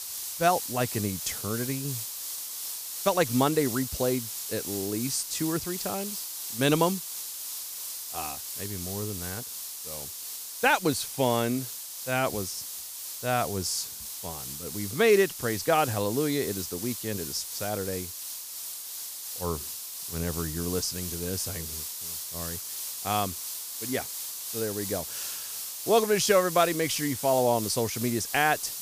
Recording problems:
hiss; loud; throughout; 5 dB below the speech

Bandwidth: 15 kHz